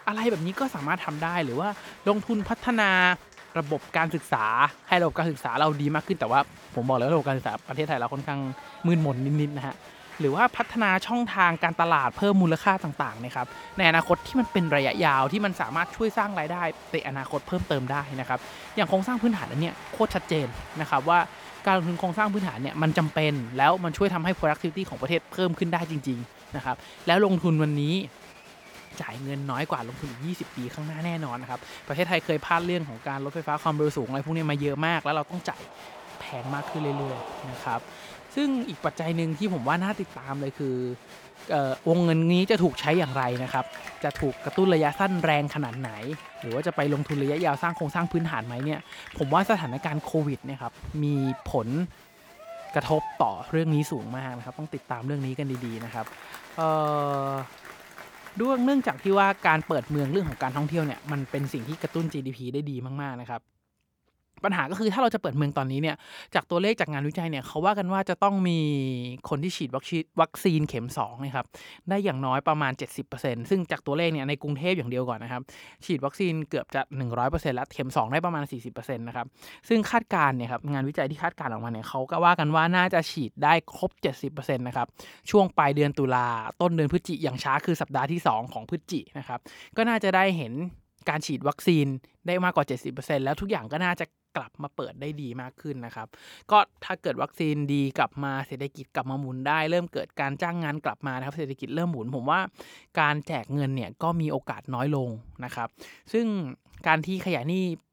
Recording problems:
crowd noise; noticeable; until 1:02; 15 dB below the speech

